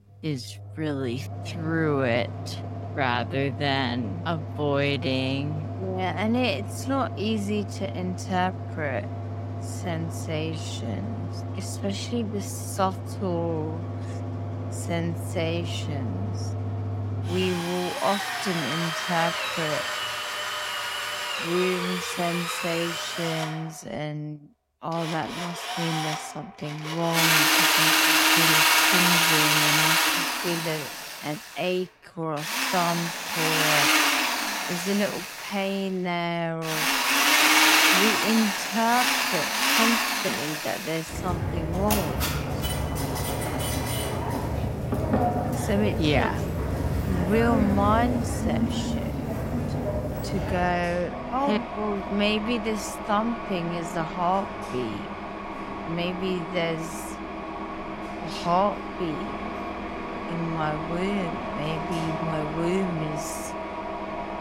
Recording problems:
wrong speed, natural pitch; too slow; 0.5 times normal speed
machinery noise; very loud; throughout; 3 dB above the speech

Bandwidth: 16 kHz